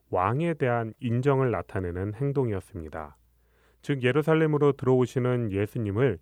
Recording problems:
none

